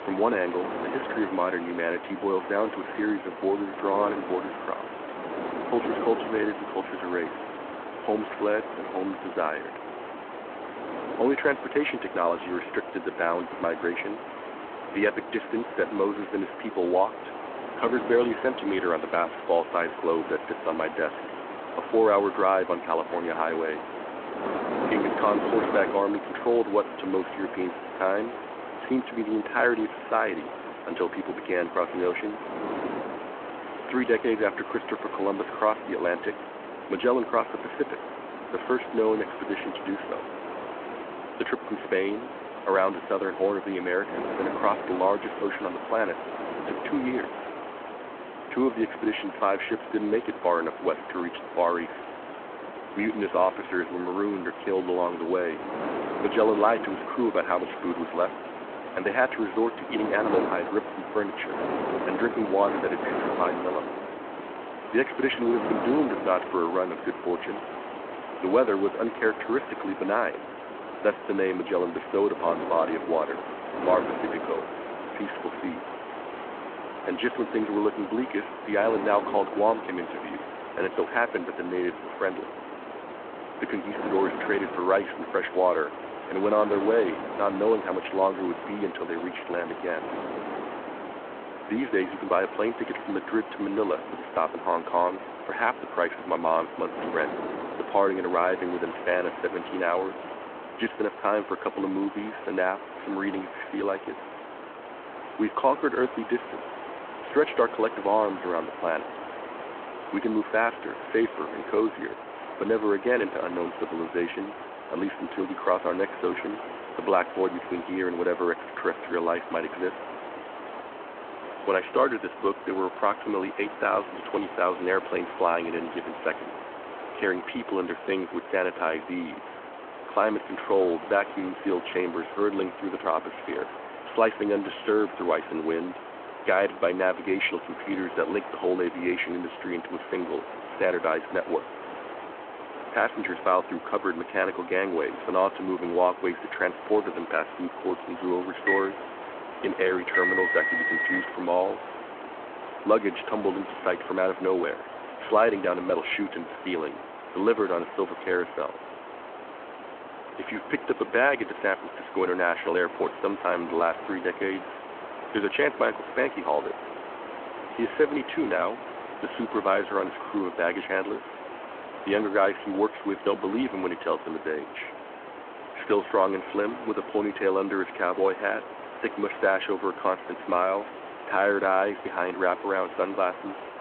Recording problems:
phone-call audio
wind noise on the microphone; occasional gusts; until 1:41; 10 dB below the speech
hiss; noticeable; throughout; 10 dB below the speech
phone ringing; loud; from 2:29 to 2:31; peak 5 dB above the speech

